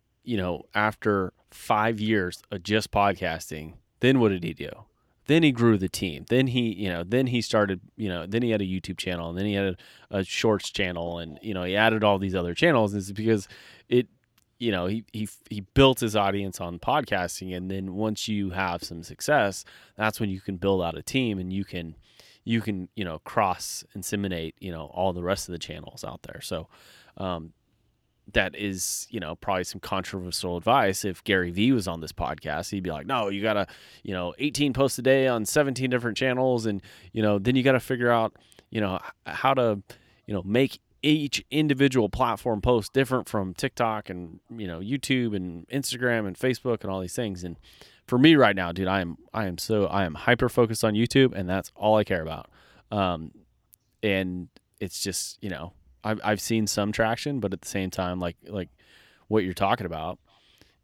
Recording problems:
none

